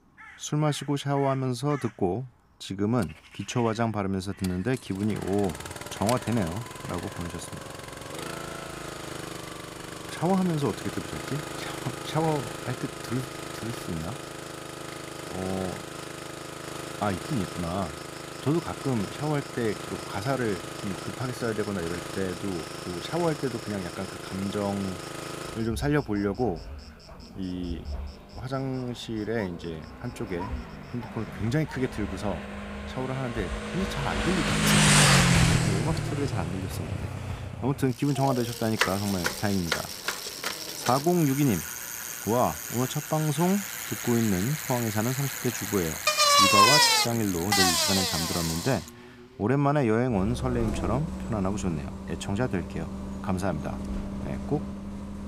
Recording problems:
traffic noise; very loud; throughout; as loud as the speech
animal sounds; noticeable; throughout; 20 dB below the speech

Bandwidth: 15.5 kHz